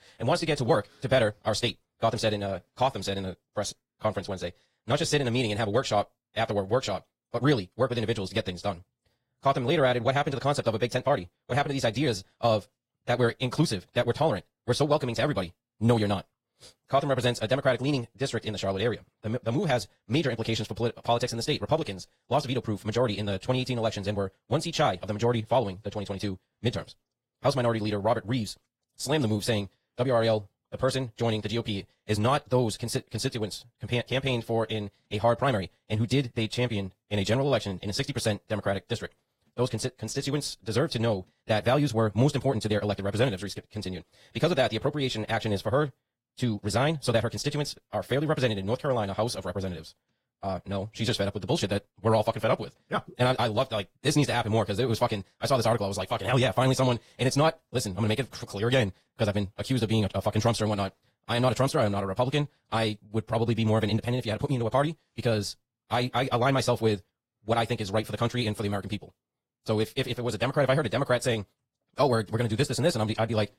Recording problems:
wrong speed, natural pitch; too fast; 1.8 times normal speed
garbled, watery; slightly

